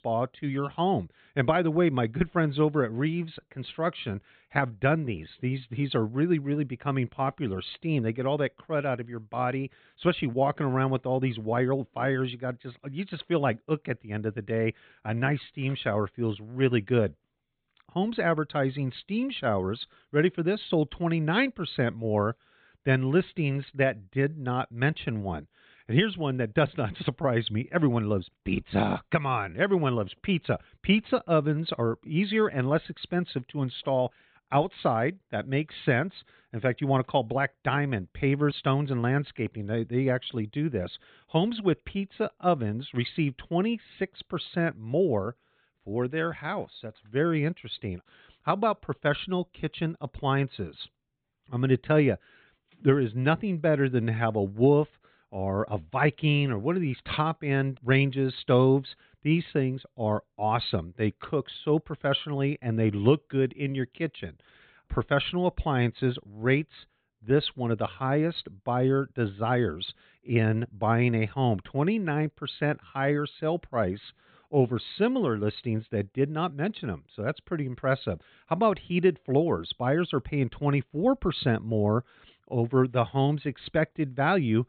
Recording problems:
high frequencies cut off; severe; nothing above 4 kHz

